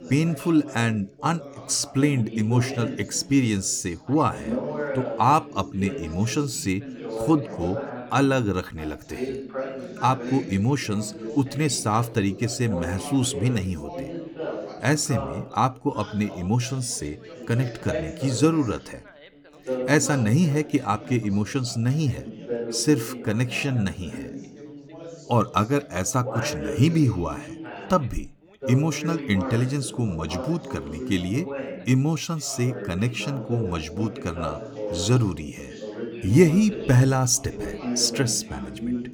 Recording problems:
background chatter; noticeable; throughout; 4 voices, 10 dB below the speech

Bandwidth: 18.5 kHz